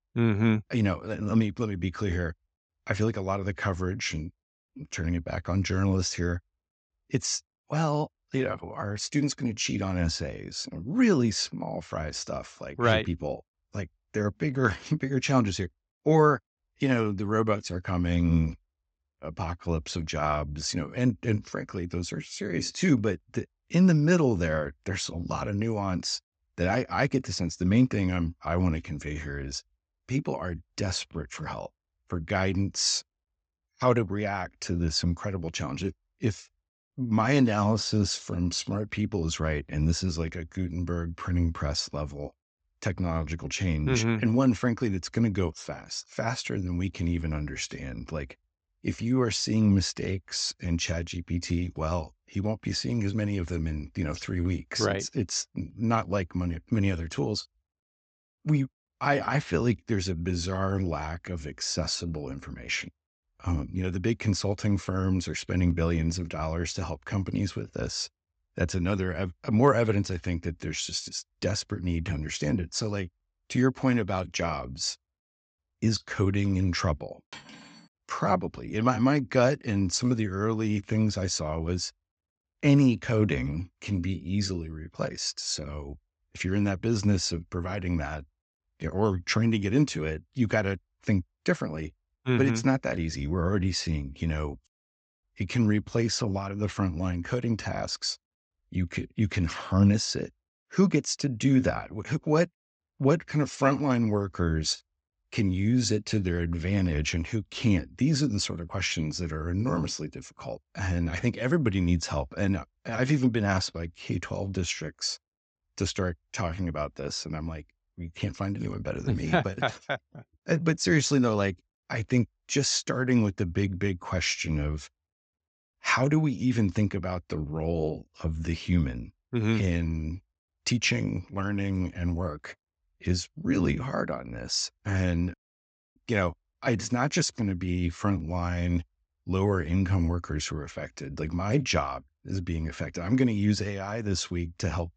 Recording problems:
high frequencies cut off; noticeable; nothing above 8 kHz
clattering dishes; faint; at 1:17; peak 15 dB below the speech

